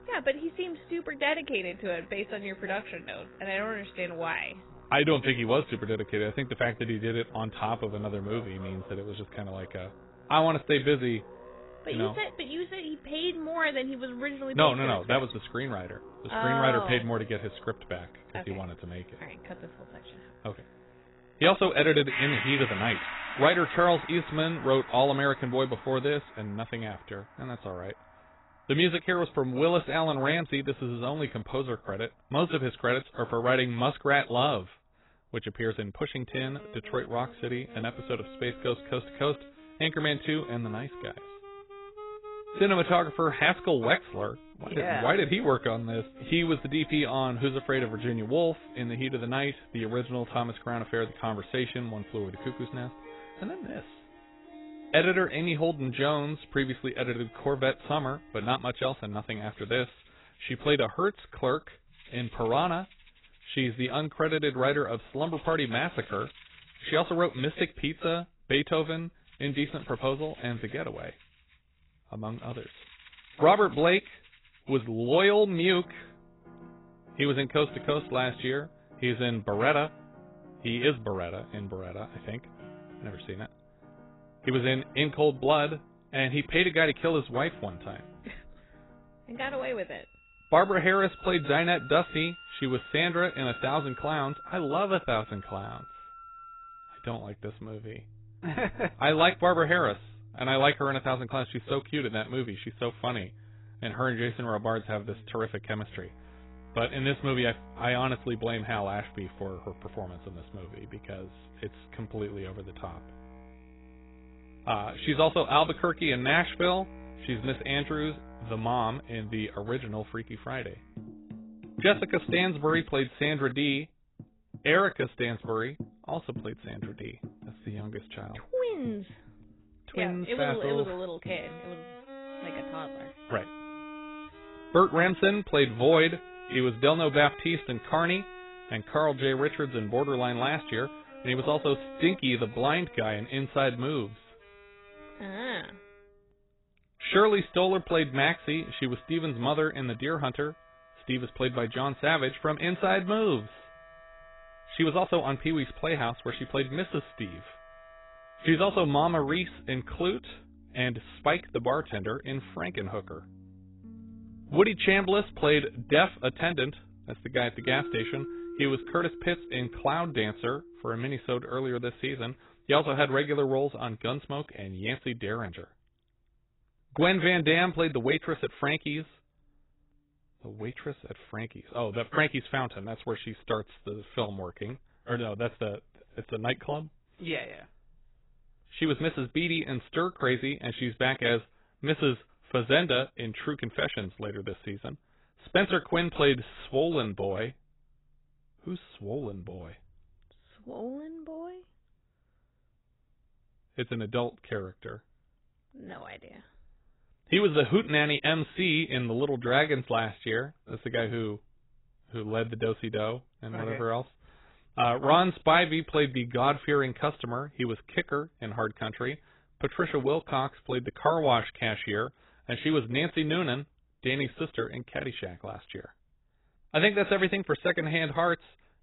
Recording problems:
garbled, watery; badly; nothing above 4 kHz
background music; noticeable; until 3:01; 20 dB below the speech

